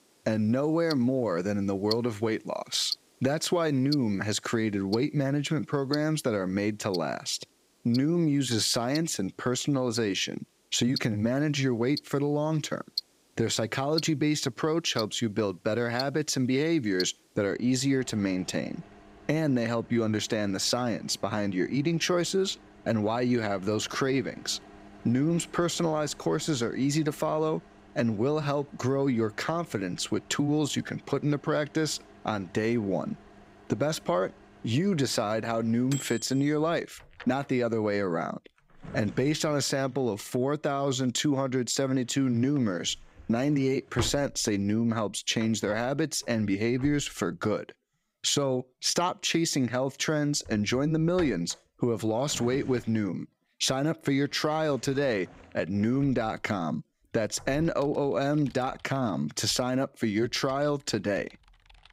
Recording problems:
household noises; noticeable; throughout; 15 dB below the speech

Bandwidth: 15.5 kHz